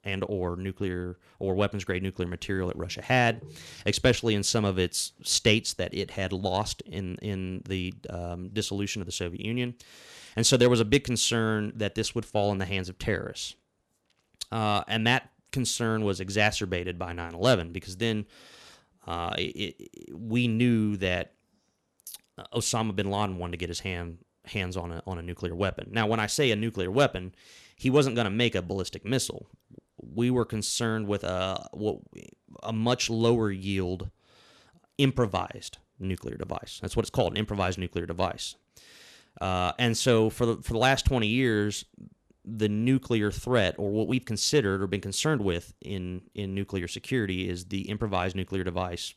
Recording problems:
none

